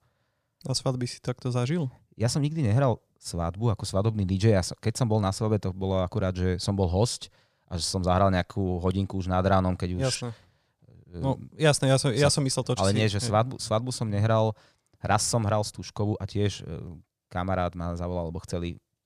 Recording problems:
none

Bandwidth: 14.5 kHz